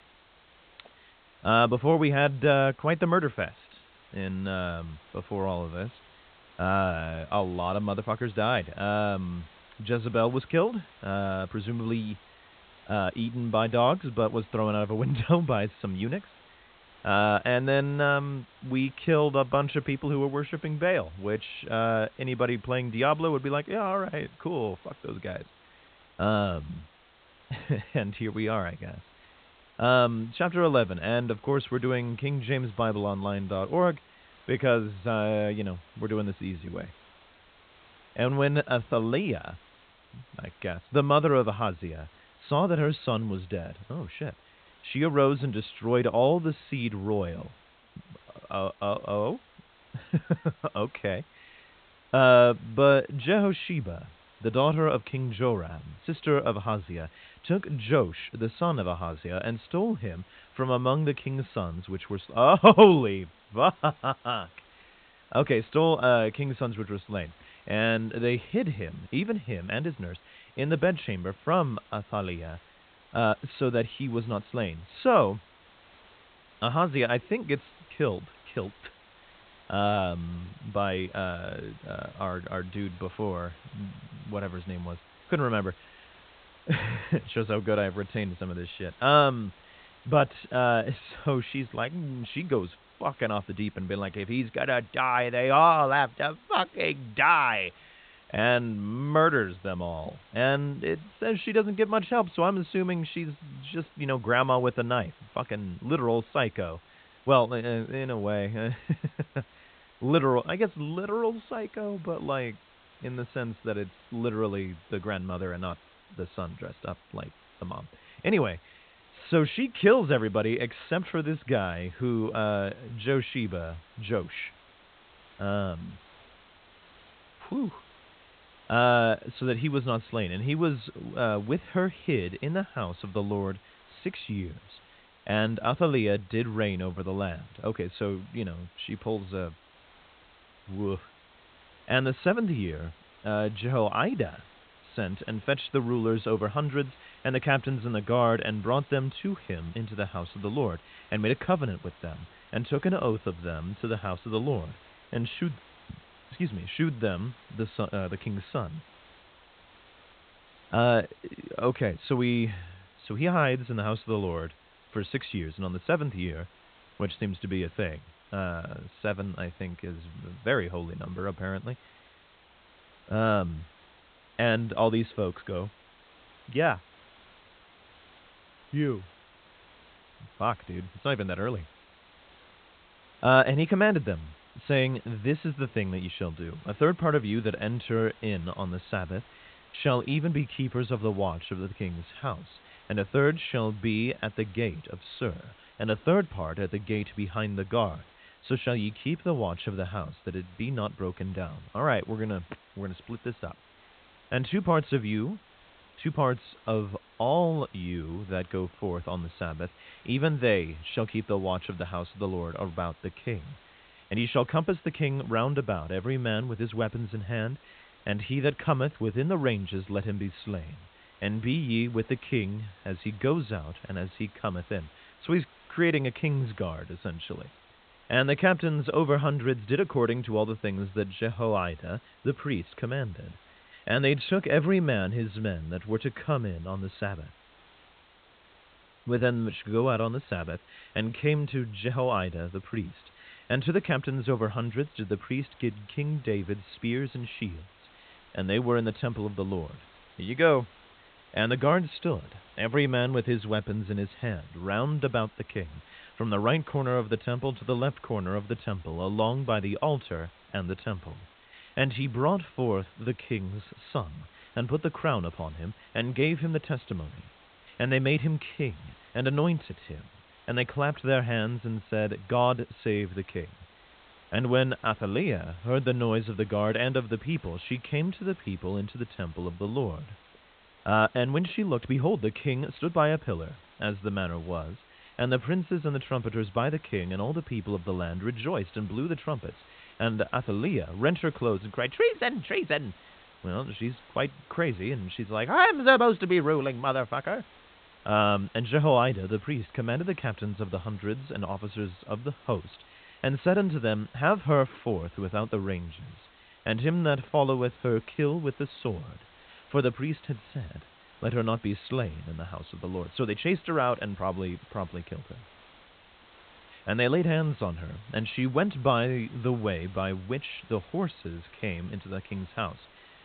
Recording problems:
high frequencies cut off; severe; nothing above 4 kHz
hiss; faint; throughout; 25 dB below the speech

